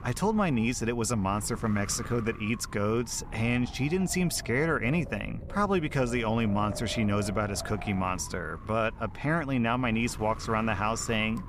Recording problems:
wind noise on the microphone; occasional gusts; 15 dB below the speech

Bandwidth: 14.5 kHz